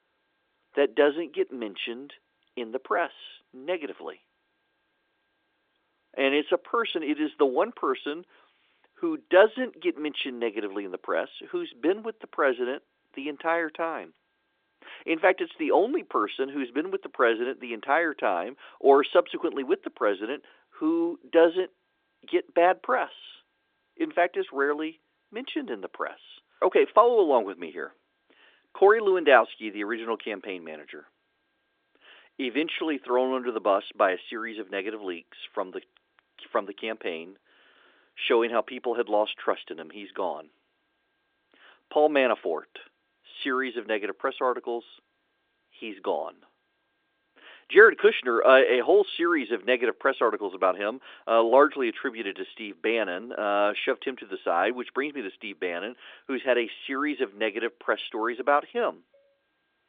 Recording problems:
phone-call audio

